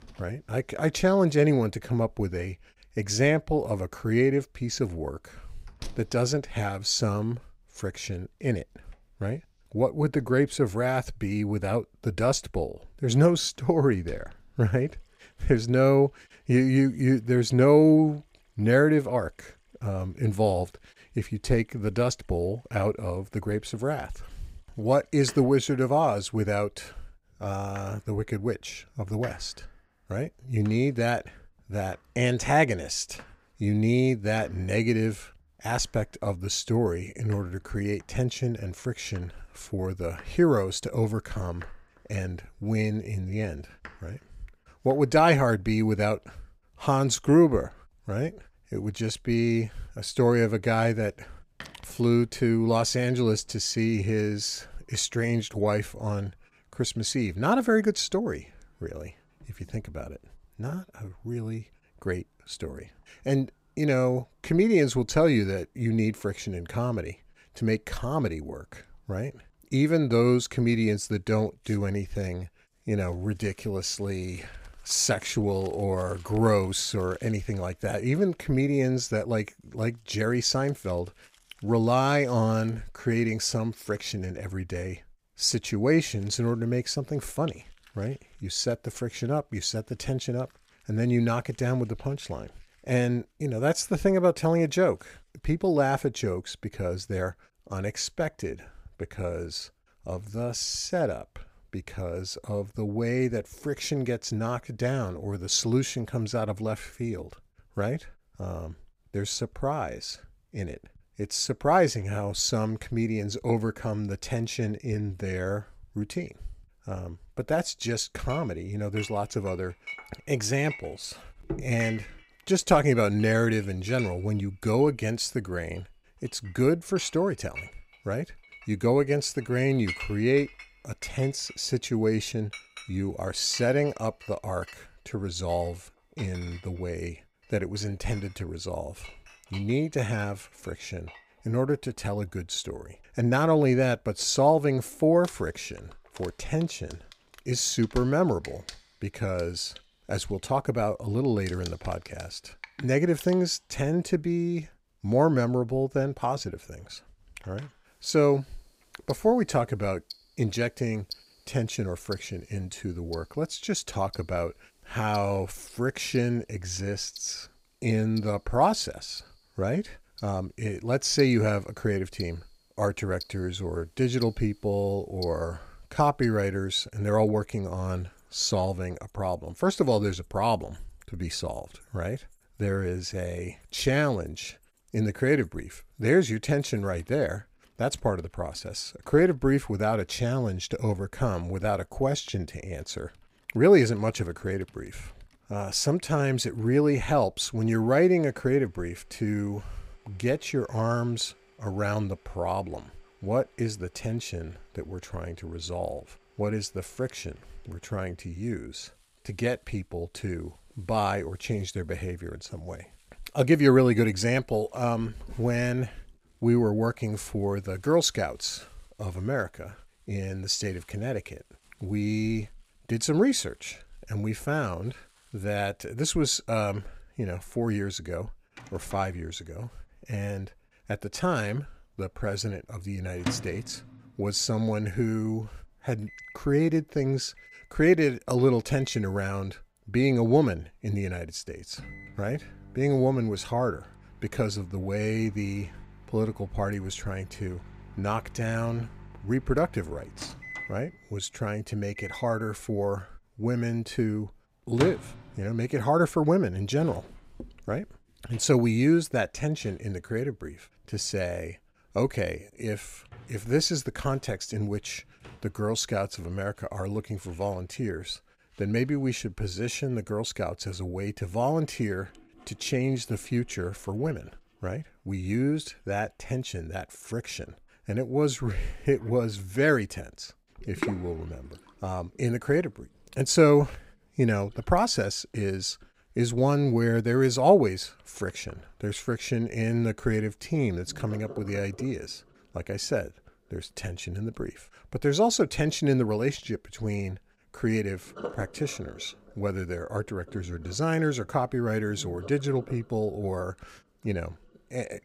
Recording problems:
household noises; noticeable; throughout; 20 dB below the speech

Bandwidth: 15.5 kHz